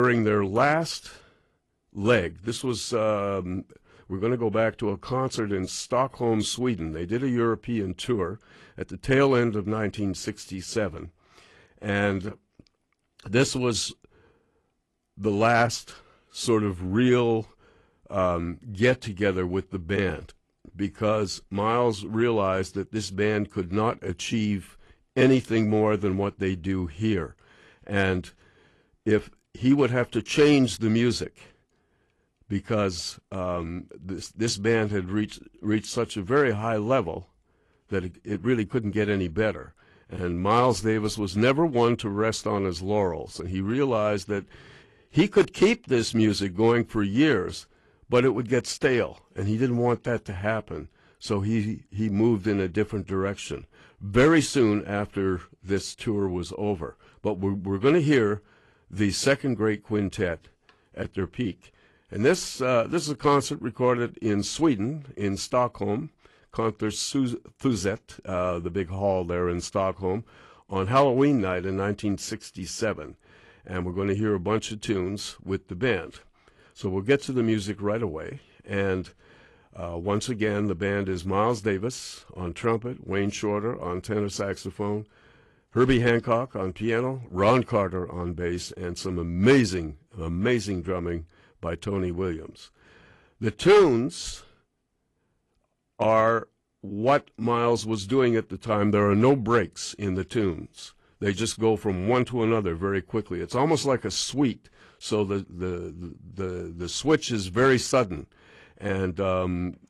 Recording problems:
garbled, watery; slightly; nothing above 11.5 kHz
abrupt cut into speech; at the start

